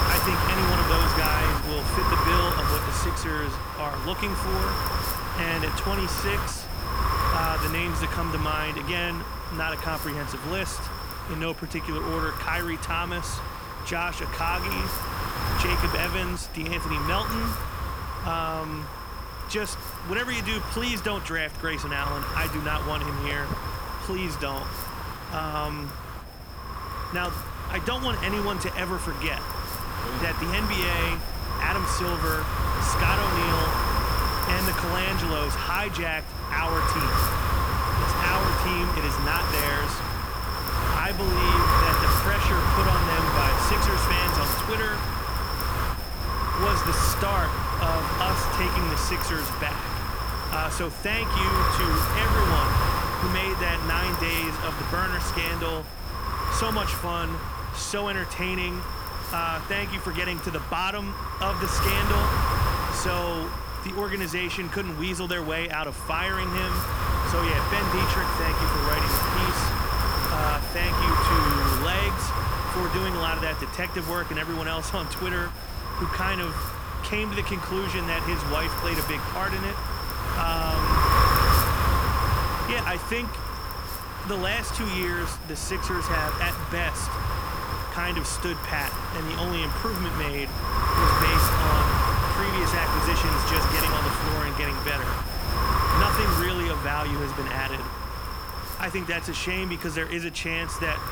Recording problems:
wind noise on the microphone; heavy; 2 dB above the speech
footsteps; noticeable; from 23 to 30 s; peak 7 dB below the speech

